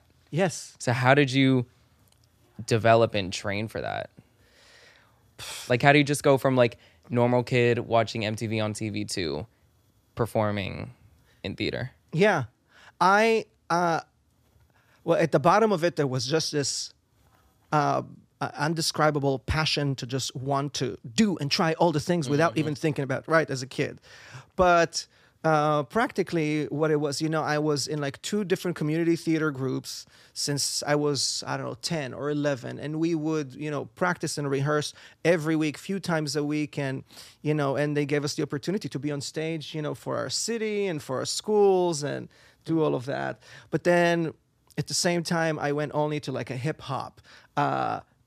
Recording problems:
none

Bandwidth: 14.5 kHz